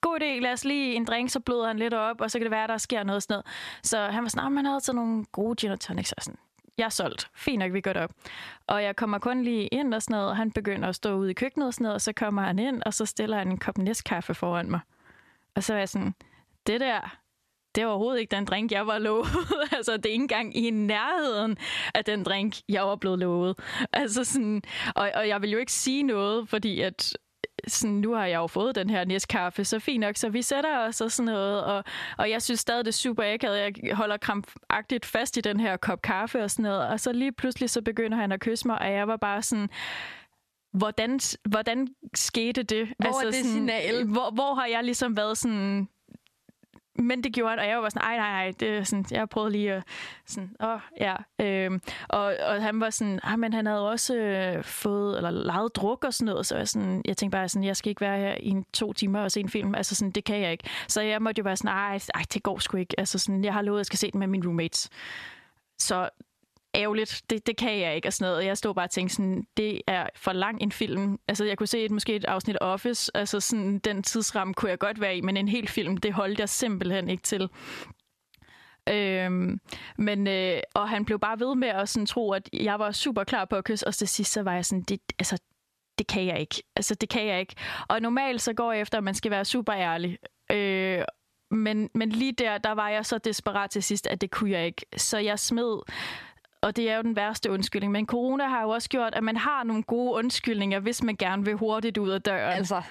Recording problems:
squashed, flat; heavily

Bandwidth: 13.5 kHz